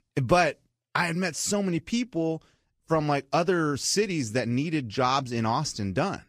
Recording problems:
garbled, watery; slightly; nothing above 15 kHz

